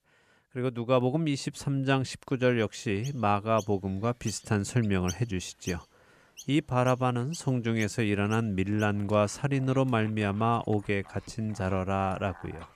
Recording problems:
animal sounds; faint; from 3 s on; 20 dB below the speech

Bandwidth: 14.5 kHz